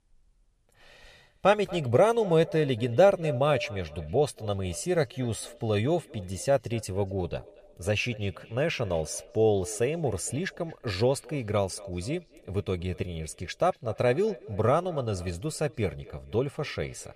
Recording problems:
echo of what is said; noticeable; throughout; 230 ms later, 20 dB below the speech

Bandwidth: 14.5 kHz